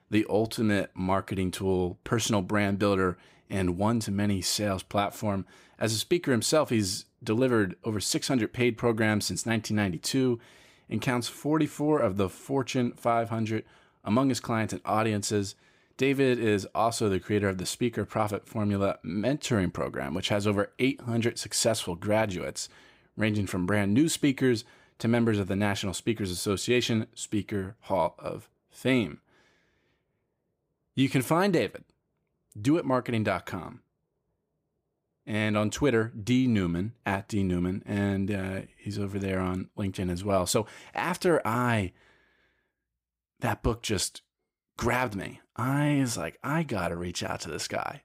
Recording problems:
none

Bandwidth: 15.5 kHz